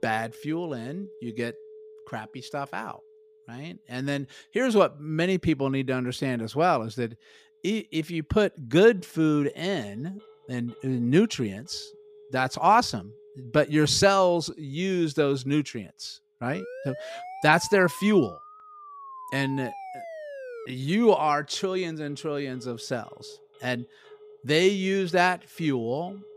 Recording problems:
alarms or sirens; faint; throughout; 25 dB below the speech
siren; faint; from 17 to 21 s; peak 15 dB below the speech

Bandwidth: 15 kHz